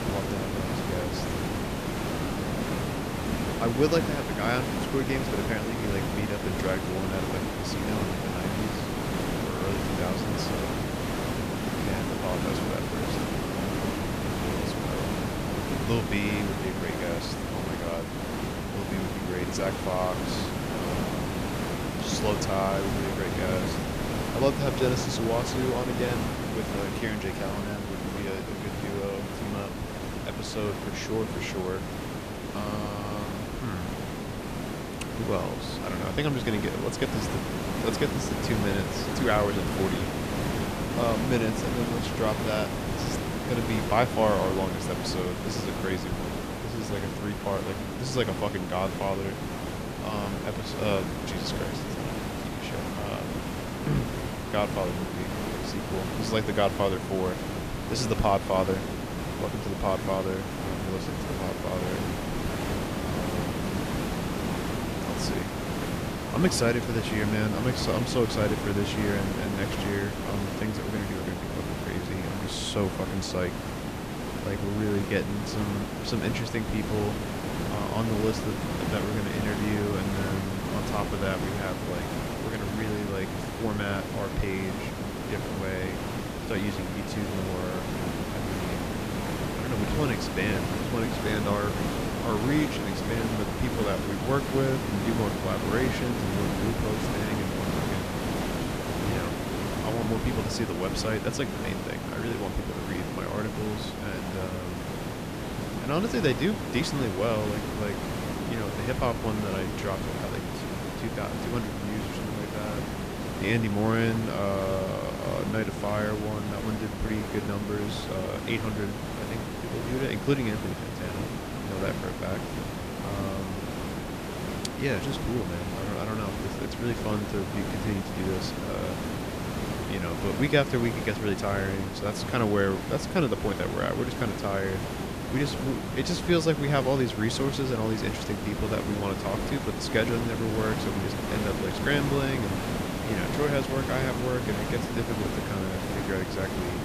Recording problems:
hiss; loud; throughout; 1 dB below the speech

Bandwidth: 14.5 kHz